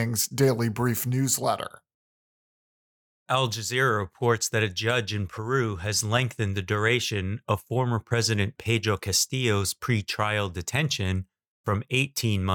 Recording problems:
abrupt cut into speech; at the start and the end

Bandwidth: 18 kHz